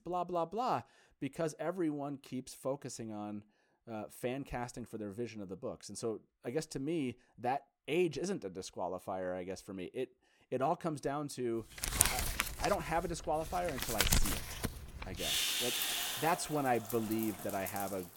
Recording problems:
household noises; very loud; from 12 s on; 3 dB above the speech

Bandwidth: 17 kHz